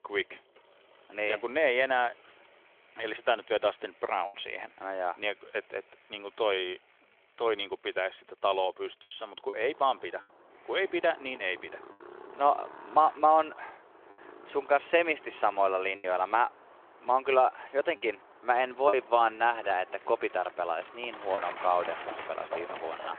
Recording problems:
phone-call audio; nothing above 3.5 kHz
traffic noise; noticeable; throughout; 15 dB below the speech
choppy; occasionally; 2% of the speech affected

